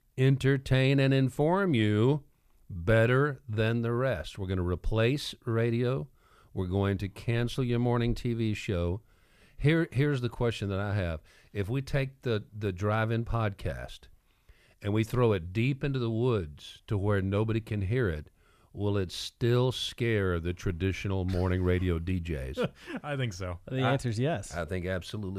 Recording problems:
abrupt cut into speech; at the end

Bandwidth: 15 kHz